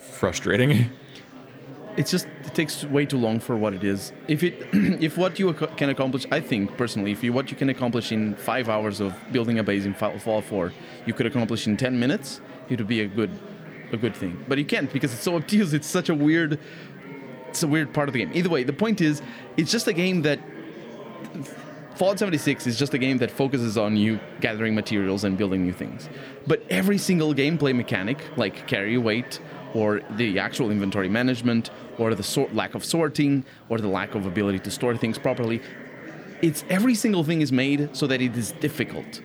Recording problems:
chatter from many people; noticeable; throughout; 15 dB below the speech

